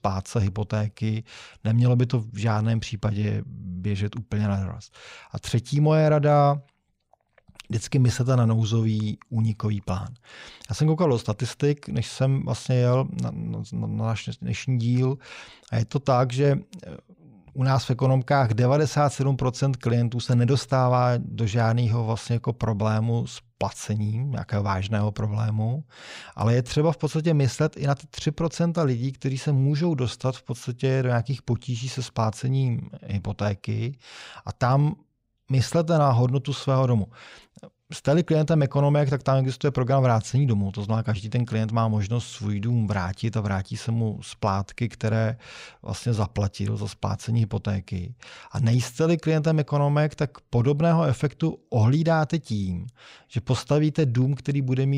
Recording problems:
abrupt cut into speech; at the end

